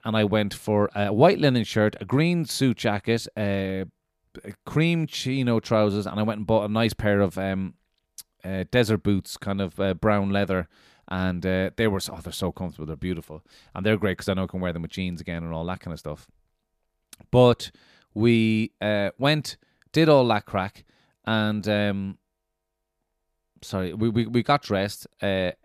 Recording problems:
none

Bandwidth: 14.5 kHz